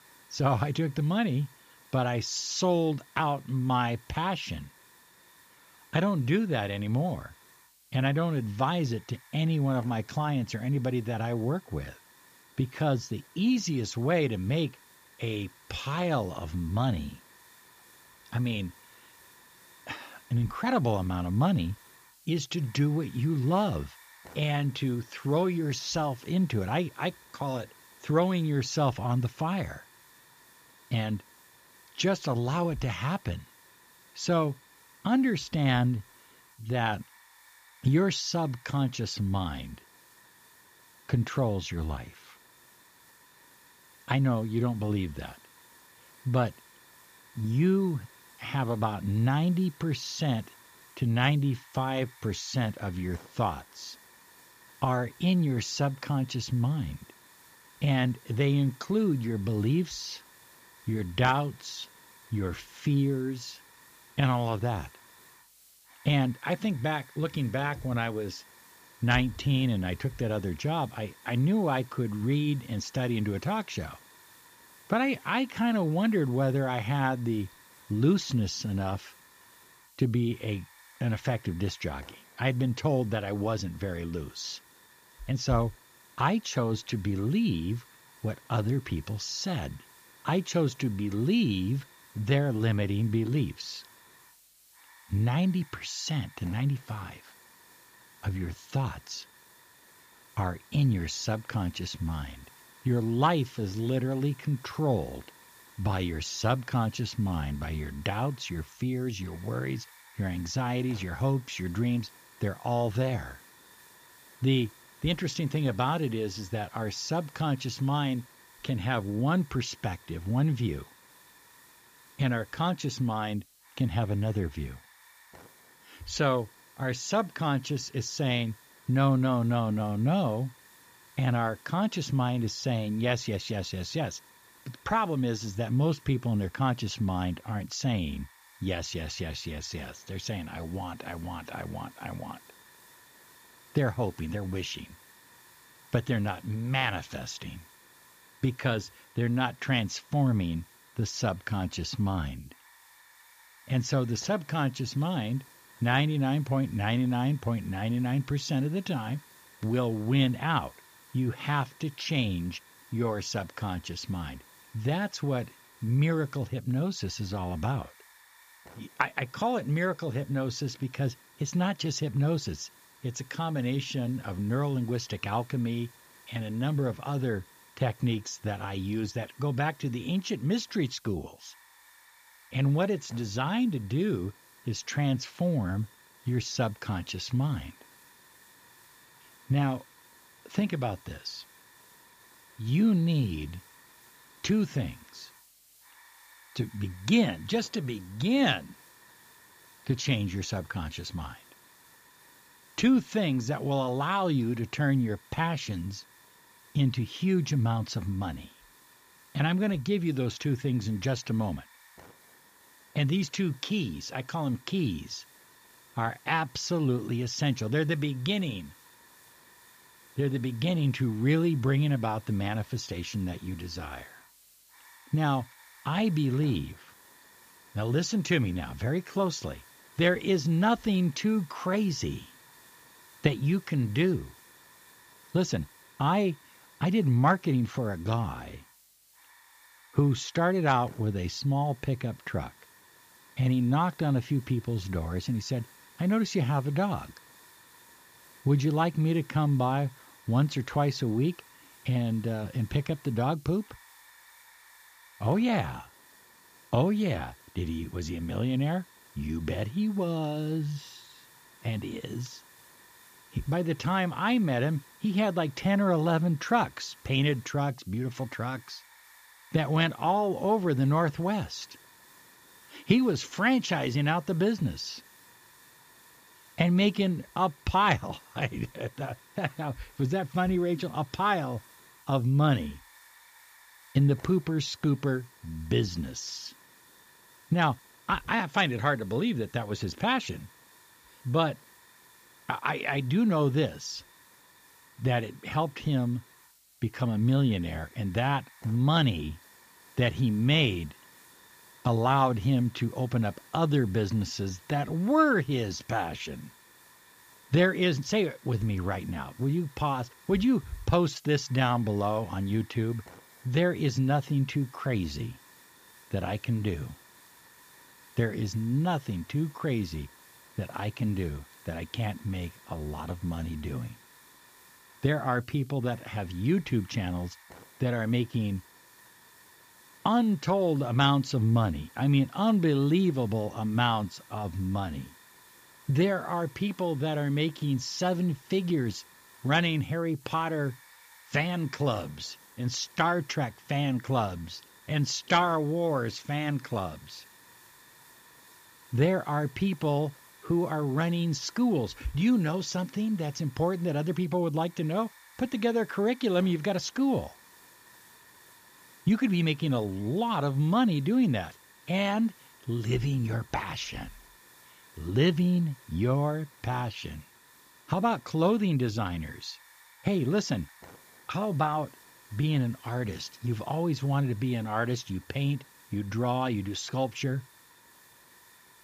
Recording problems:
high frequencies cut off; noticeable; nothing above 8 kHz
hiss; faint; throughout; 25 dB below the speech

